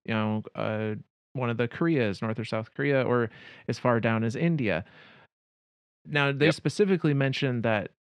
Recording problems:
muffled; slightly; fading above 3 kHz

